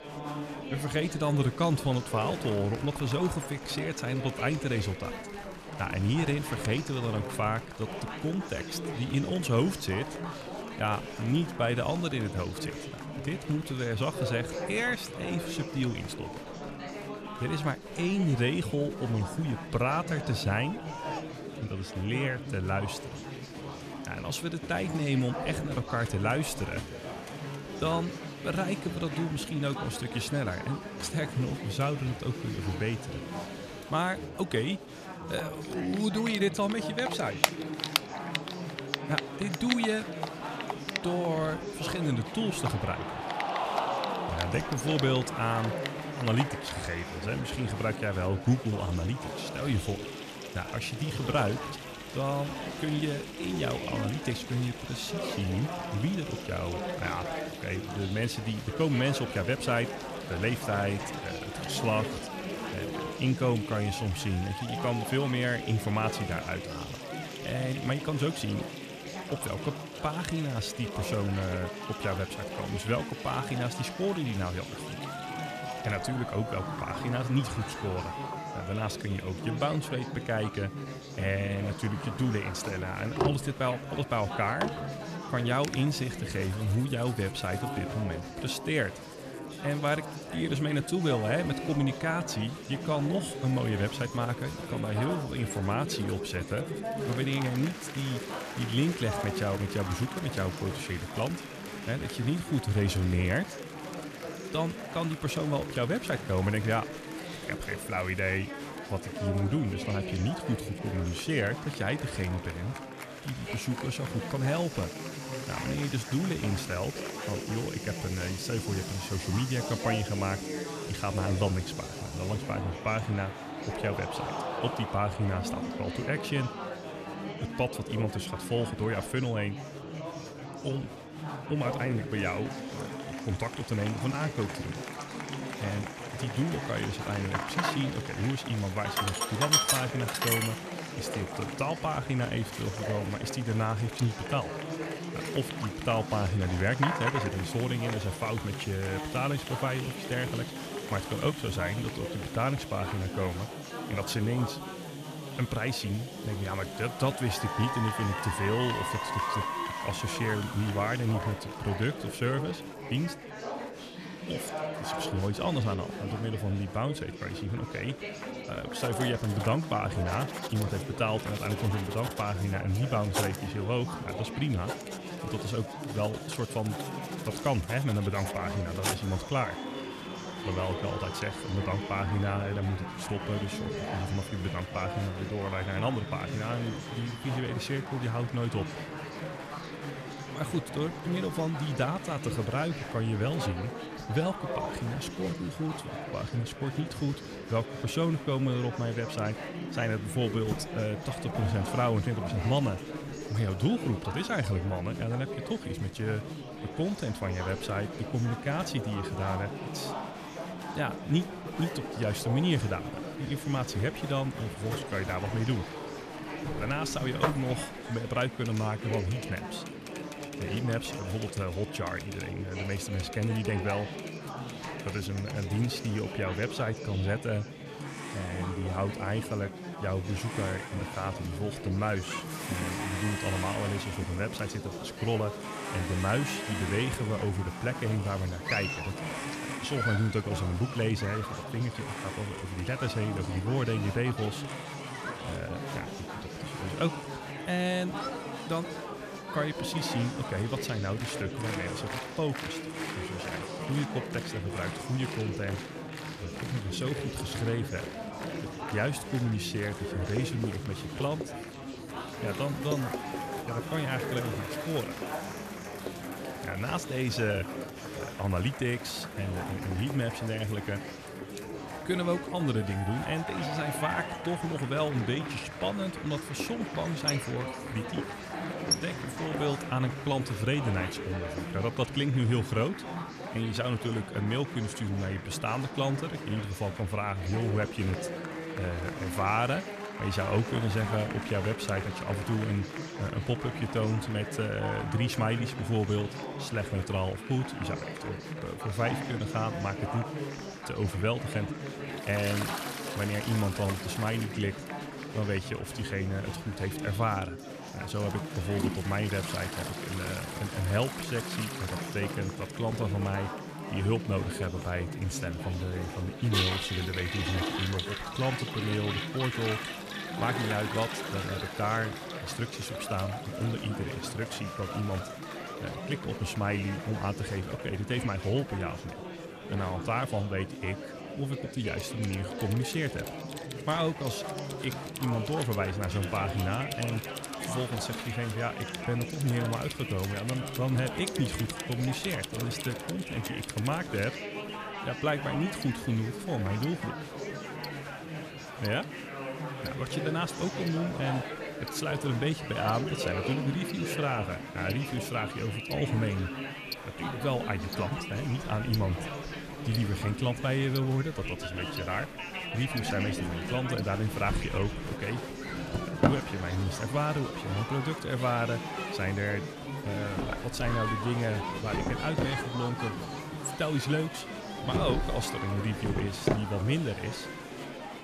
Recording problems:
household noises; loud; throughout; 8 dB below the speech
murmuring crowd; loud; throughout; 6 dB below the speech

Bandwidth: 14.5 kHz